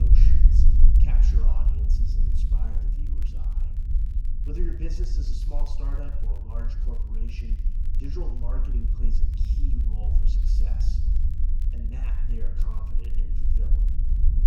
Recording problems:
room echo; slight; dies away in 0.8 s
off-mic speech; somewhat distant
low rumble; loud; throughout; as loud as the speech
crackle, like an old record; noticeable; 20 dB below the speech
abrupt cut into speech; at the start

